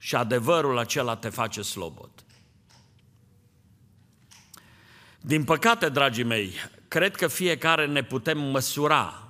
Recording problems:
none

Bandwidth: 15 kHz